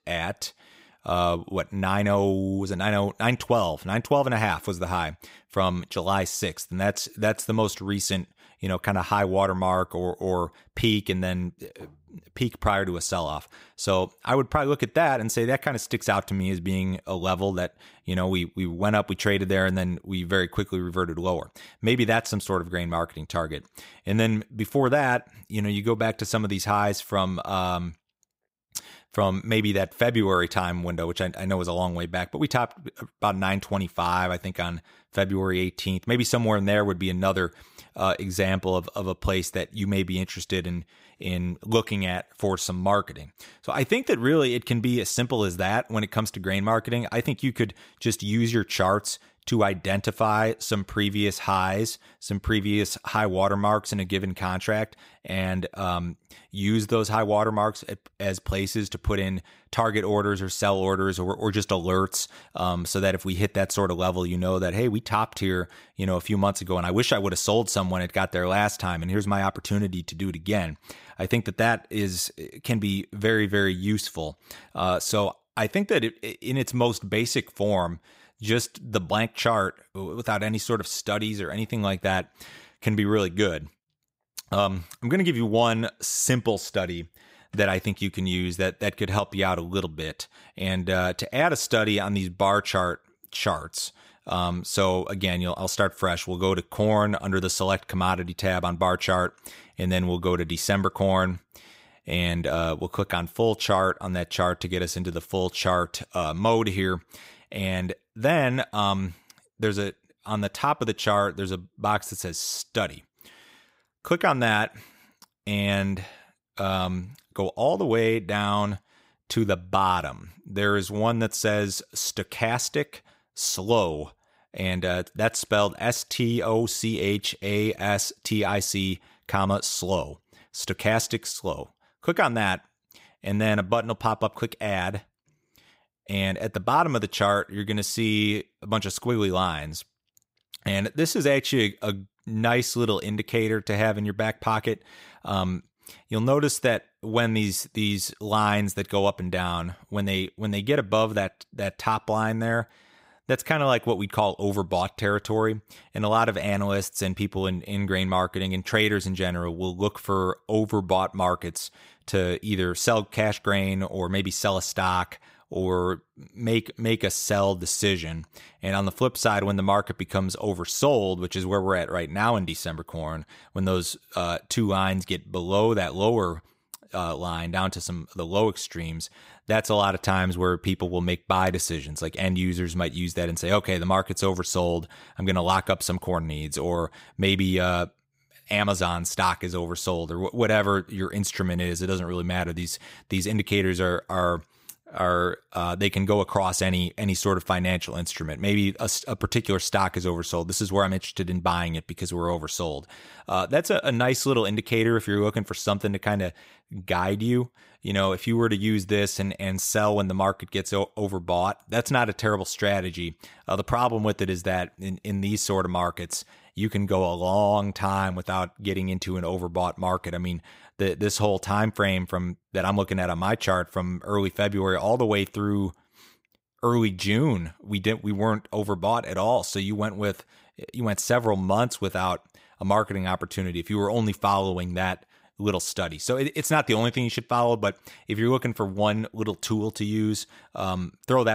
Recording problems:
abrupt cut into speech; at the end

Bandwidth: 15.5 kHz